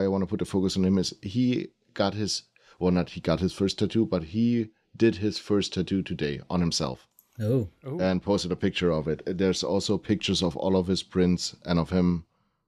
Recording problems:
abrupt cut into speech; at the start

